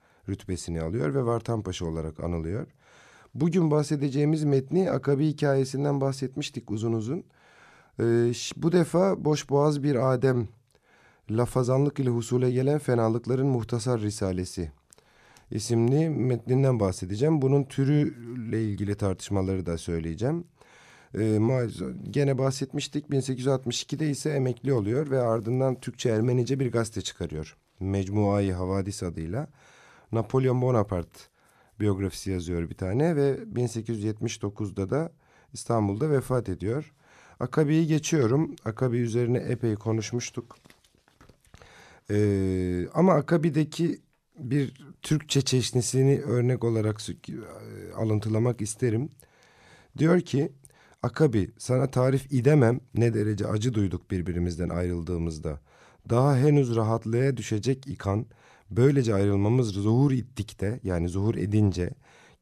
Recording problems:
none

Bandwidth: 14 kHz